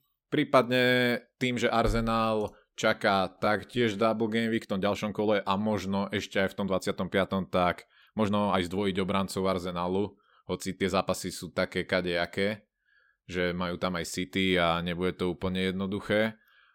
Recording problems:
uneven, jittery; strongly; from 1.5 to 14 s

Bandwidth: 16.5 kHz